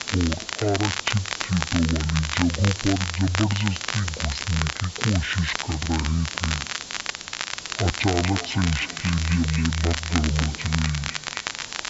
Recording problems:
wrong speed and pitch; too slow and too low; 0.5 times normal speed
echo of what is said; noticeable; from 7.5 s on; 250 ms later, 15 dB below the speech
high frequencies cut off; slight; nothing above 8 kHz
crackle, like an old record; loud; 4 dB below the speech
hiss; noticeable; throughout; 10 dB below the speech

